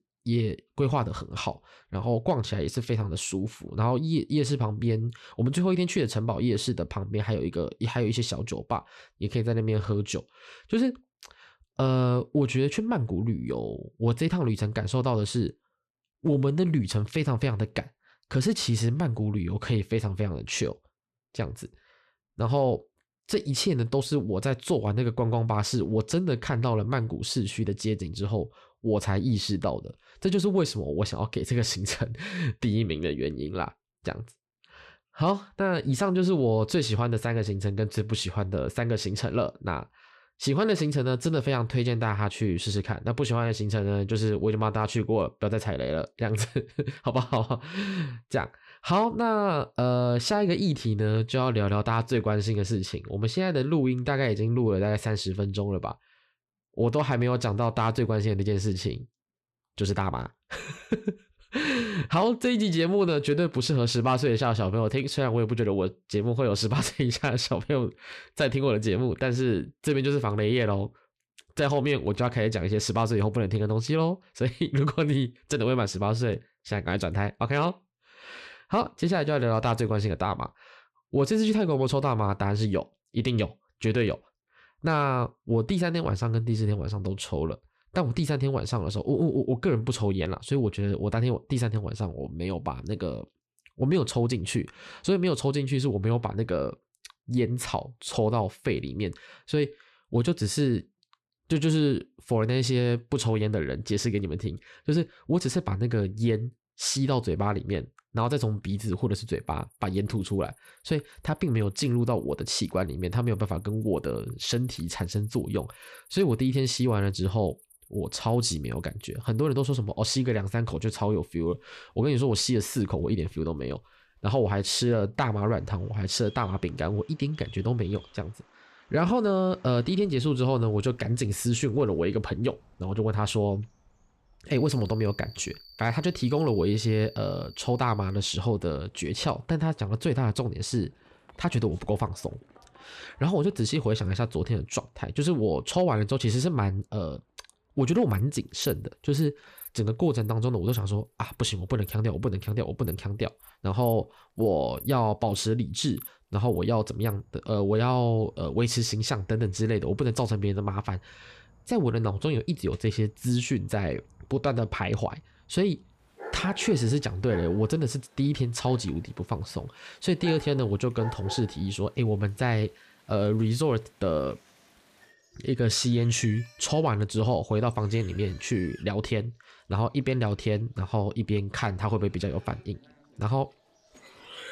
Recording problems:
animal sounds; faint; from 1:49 on; 20 dB below the speech

